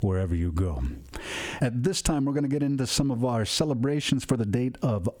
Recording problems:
squashed, flat; somewhat

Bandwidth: 18.5 kHz